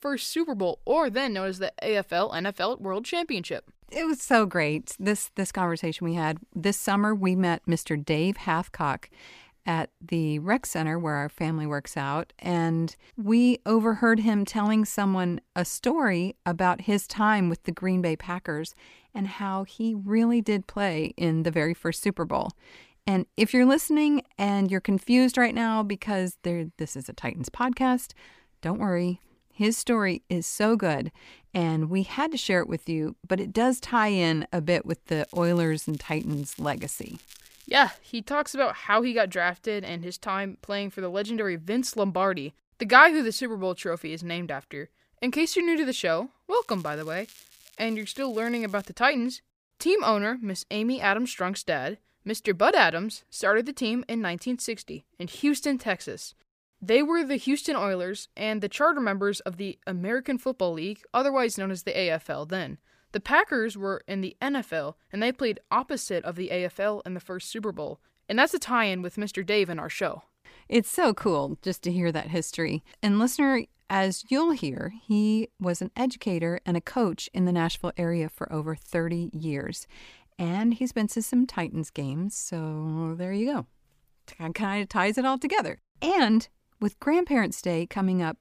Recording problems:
crackling; faint; from 35 to 38 s and from 47 to 49 s; 25 dB below the speech

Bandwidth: 15 kHz